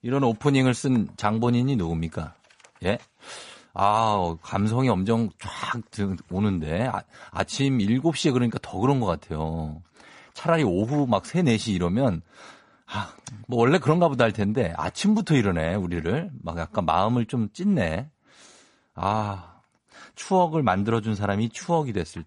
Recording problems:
garbled, watery; slightly; nothing above 10.5 kHz

